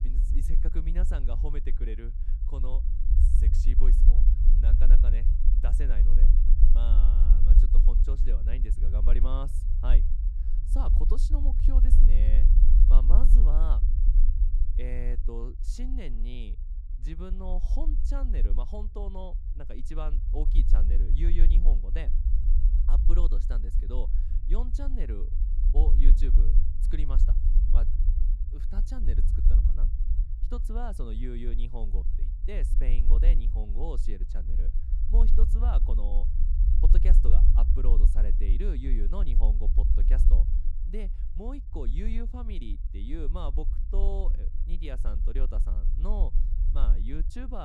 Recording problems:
low rumble; loud; throughout; 5 dB below the speech
abrupt cut into speech; at the end

